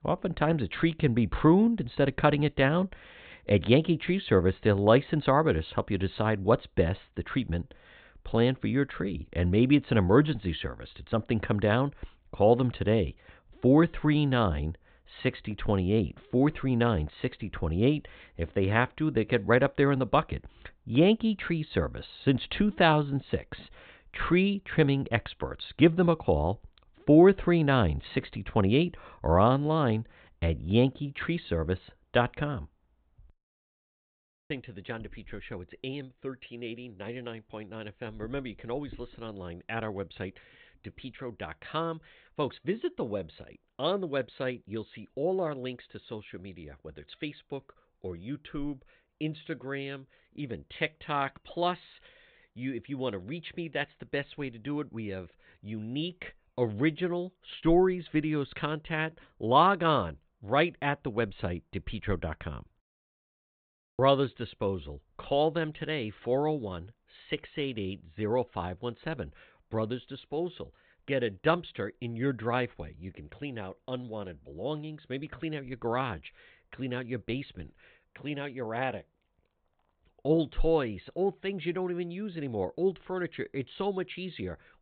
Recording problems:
high frequencies cut off; severe; nothing above 4 kHz

